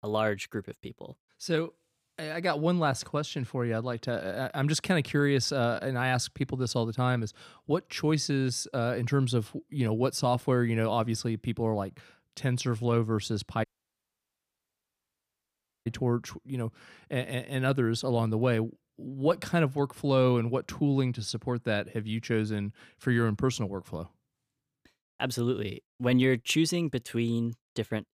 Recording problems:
audio cutting out; at 14 s for 2 s

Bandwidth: 15 kHz